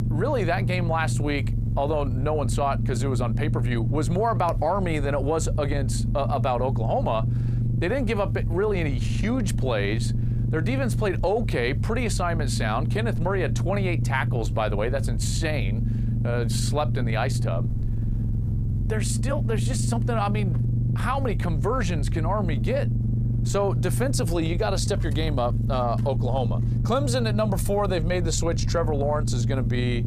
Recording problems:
squashed, flat; somewhat
low rumble; noticeable; throughout; 10 dB below the speech

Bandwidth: 15 kHz